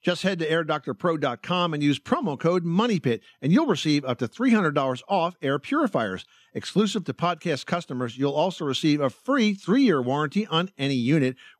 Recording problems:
none

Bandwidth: 13.5 kHz